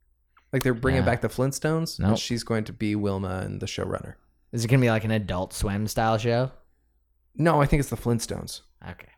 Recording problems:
none

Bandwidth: 18.5 kHz